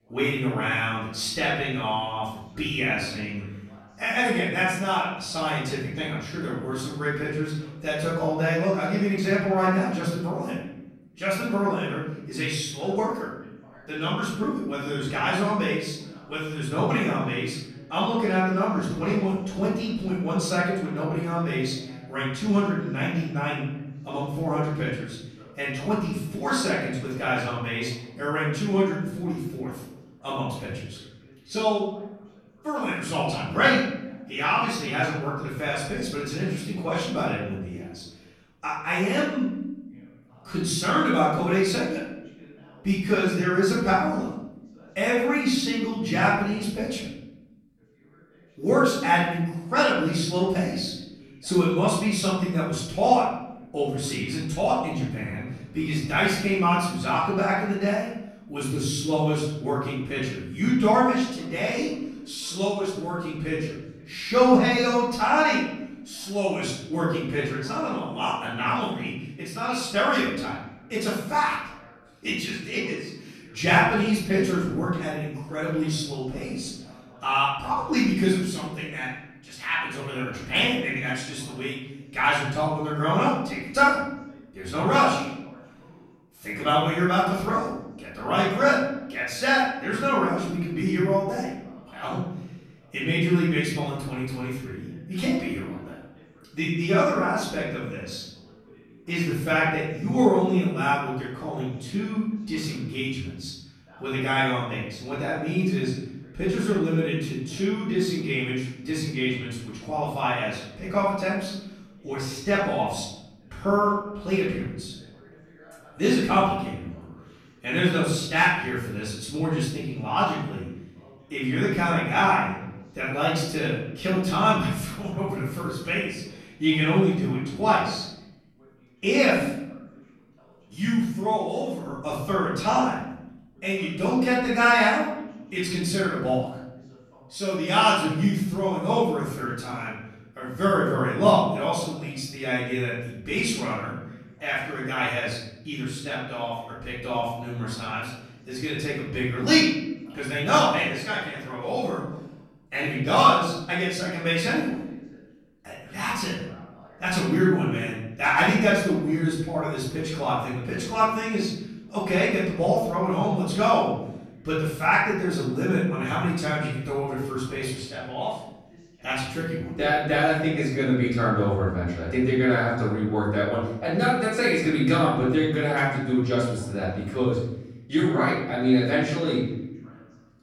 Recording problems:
off-mic speech; far
room echo; noticeable; dies away in 0.9 s
voice in the background; faint; throughout; 30 dB below the speech

